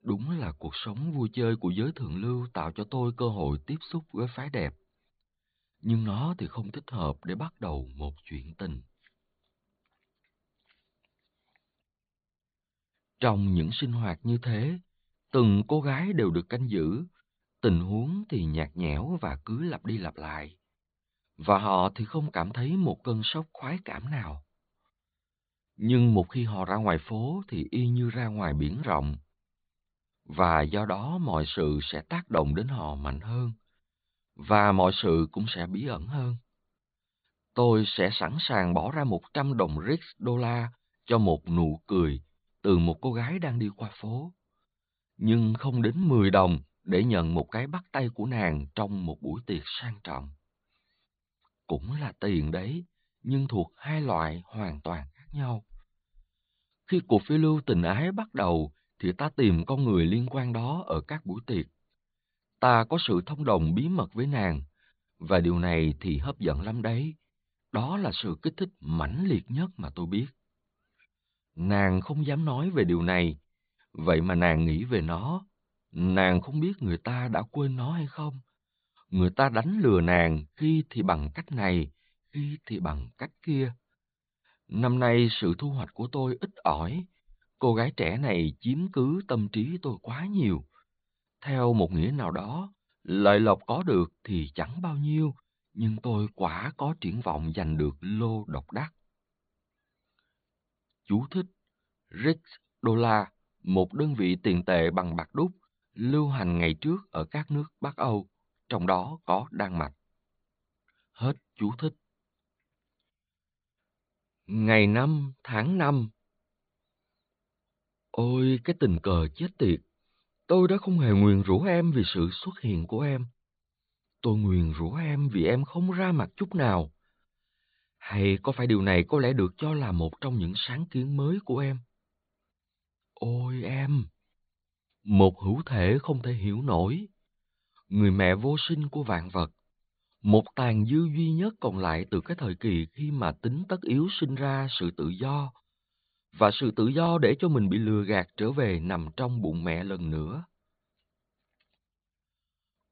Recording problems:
high frequencies cut off; severe; nothing above 4.5 kHz

